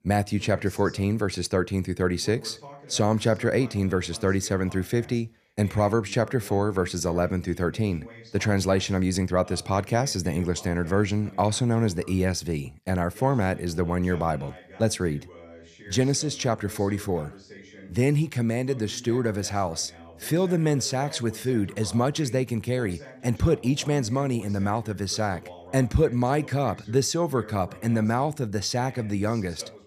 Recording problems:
voice in the background; faint; throughout; 20 dB below the speech

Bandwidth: 14.5 kHz